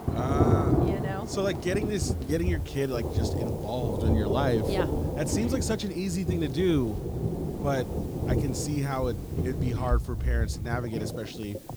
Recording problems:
rain or running water; very loud; throughout; 1 dB above the speech
household noises; faint; throughout; 20 dB below the speech
hiss; faint; throughout; 20 dB below the speech

